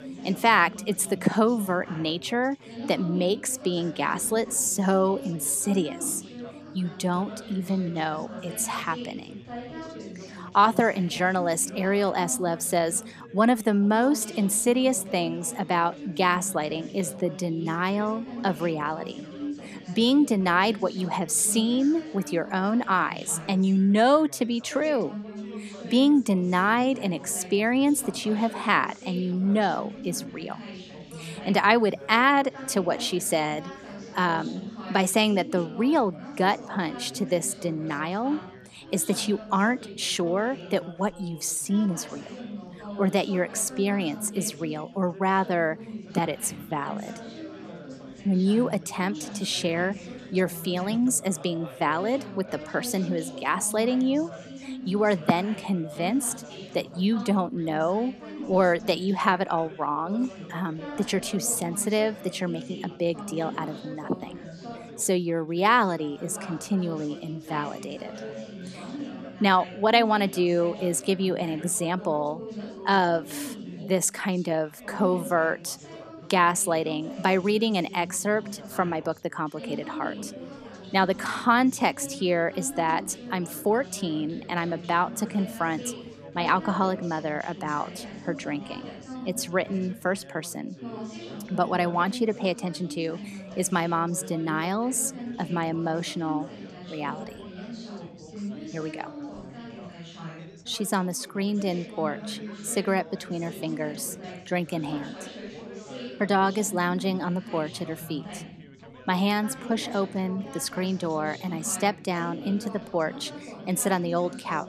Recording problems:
background chatter; noticeable; throughout; 4 voices, 15 dB below the speech

